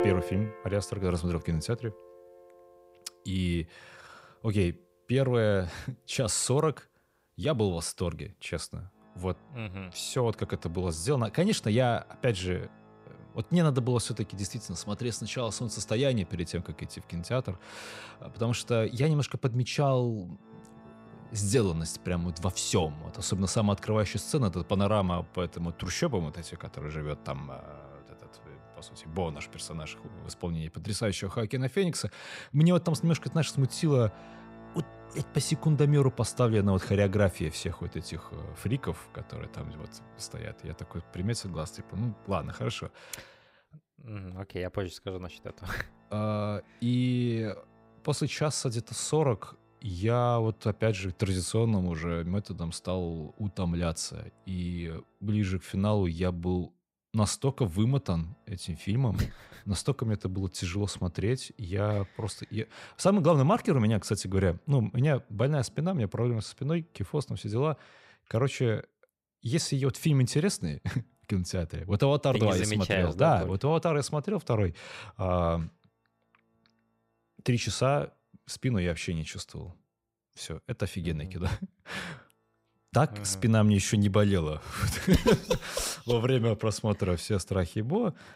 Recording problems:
background music; faint; throughout; 20 dB below the speech

